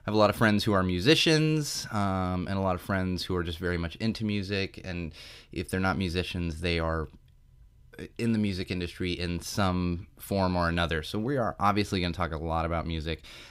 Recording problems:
none

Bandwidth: 15.5 kHz